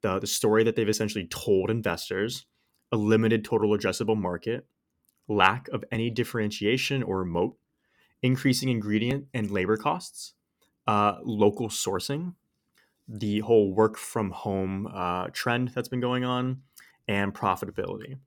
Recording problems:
none

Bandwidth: 17.5 kHz